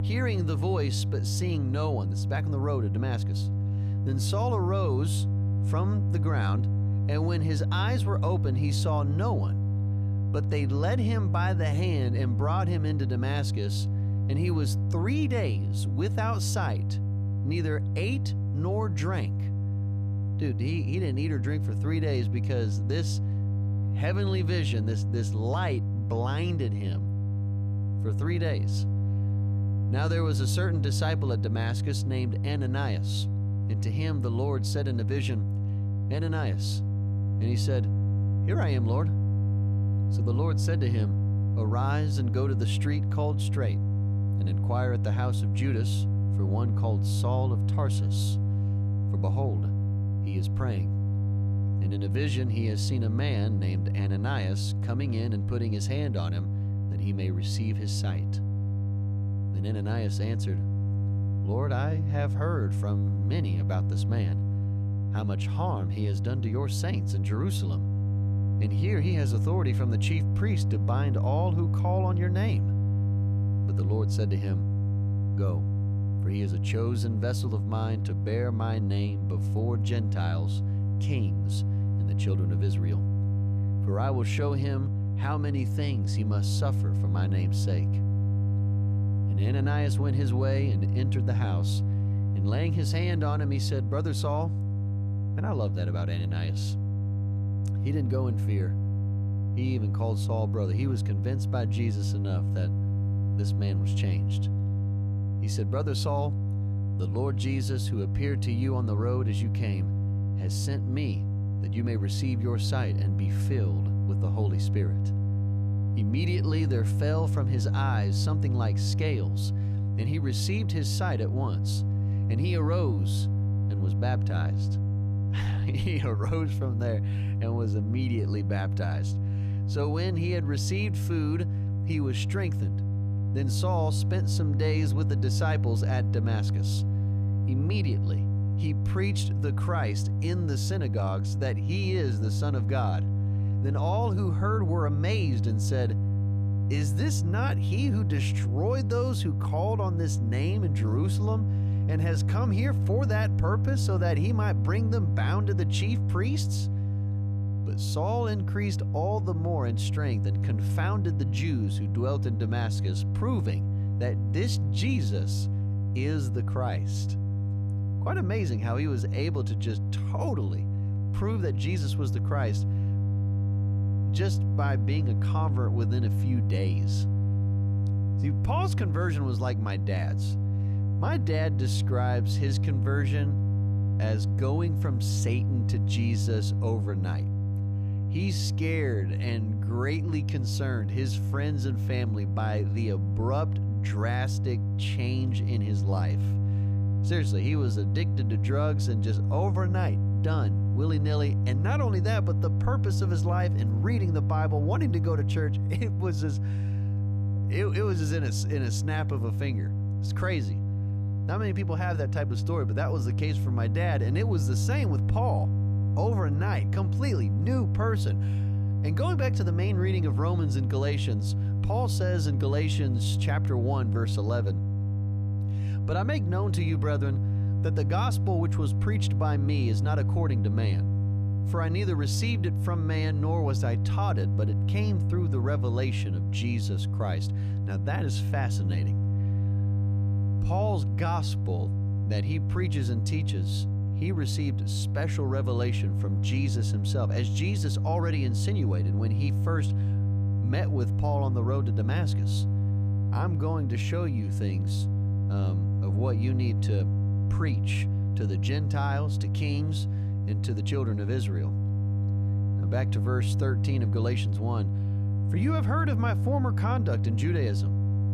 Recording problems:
electrical hum; loud; throughout; 50 Hz, 6 dB below the speech

